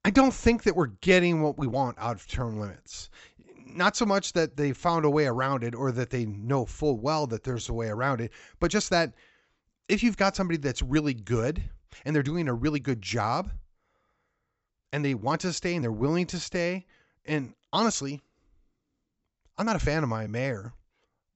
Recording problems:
high frequencies cut off; noticeable; nothing above 8 kHz
uneven, jittery; strongly; from 1 to 21 s

